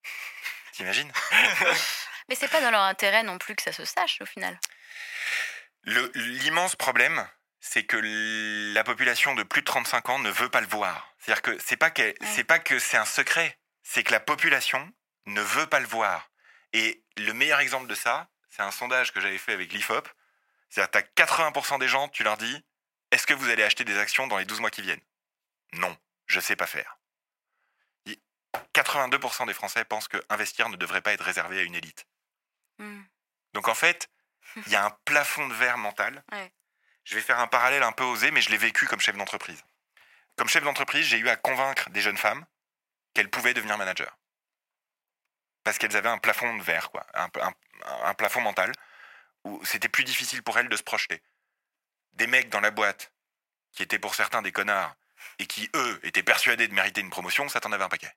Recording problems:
thin; very; fading below 650 Hz

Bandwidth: 16 kHz